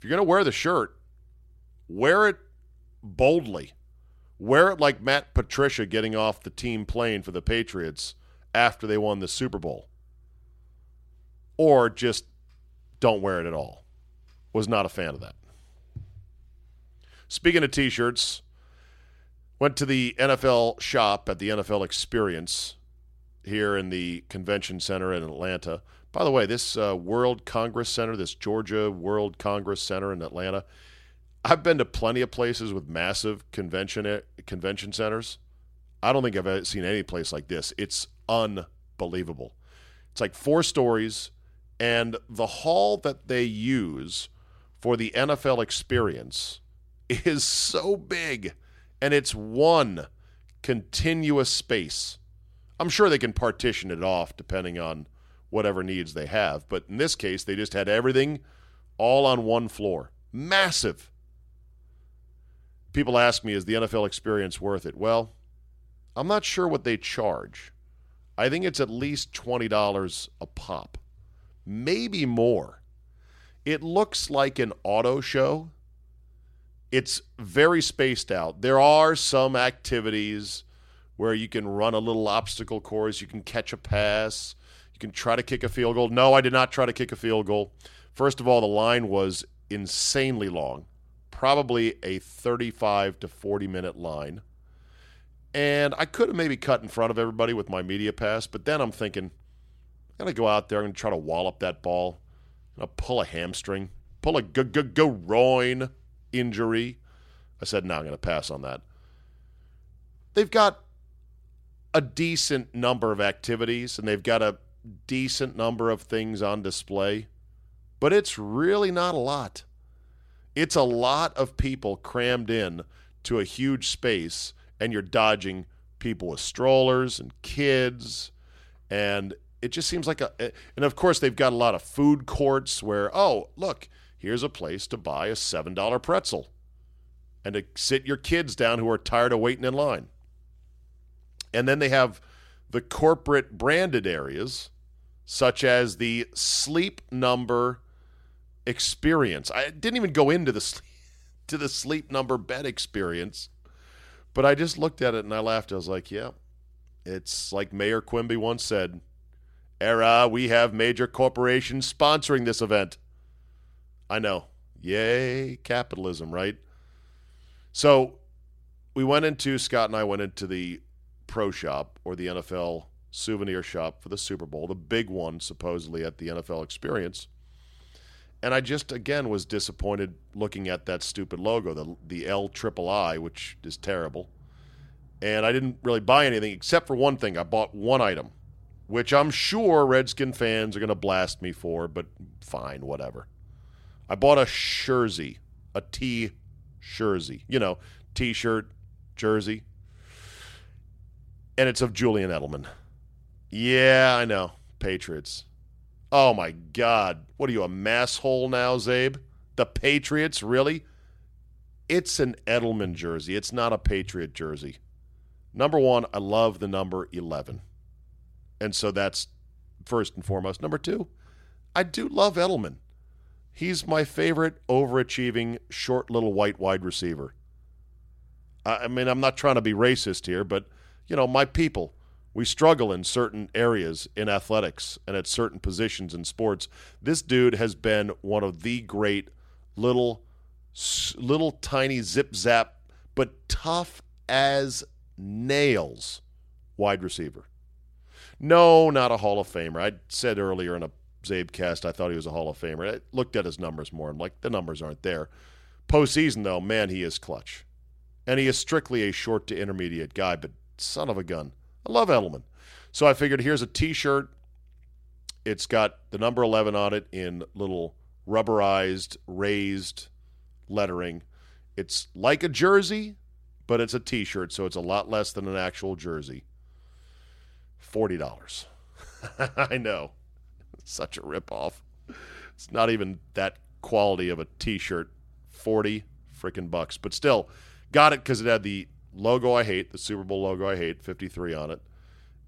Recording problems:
none

